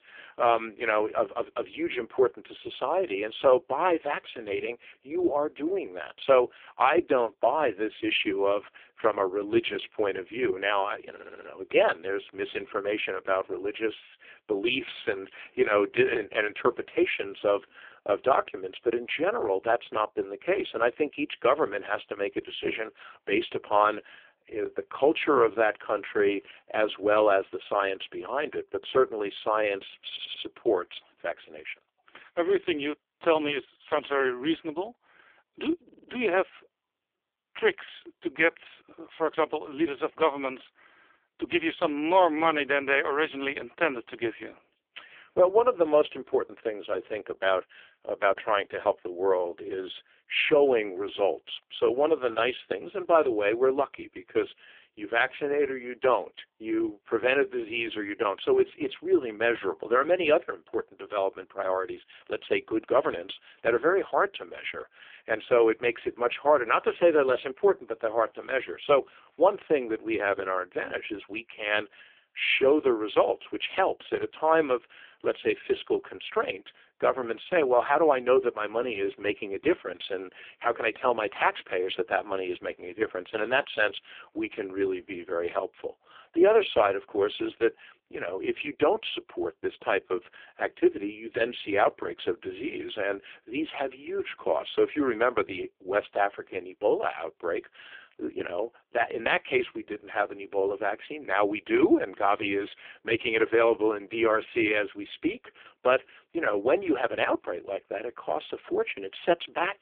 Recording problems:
phone-call audio; poor line; nothing above 3.5 kHz
audio stuttering; at 11 s, at 30 s and at 36 s

